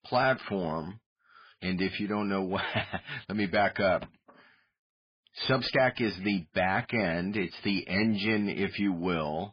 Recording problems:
garbled, watery; badly; nothing above 4.5 kHz
distortion; slight; 10 dB below the speech

